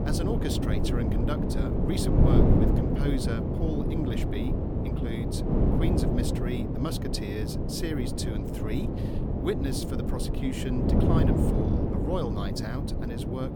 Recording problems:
wind noise on the microphone; heavy; 3 dB above the speech

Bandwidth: 18 kHz